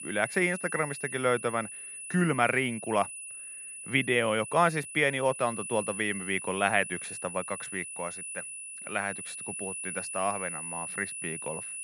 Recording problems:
high-pitched whine; loud; throughout; 10 kHz, 8 dB below the speech

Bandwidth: 13.5 kHz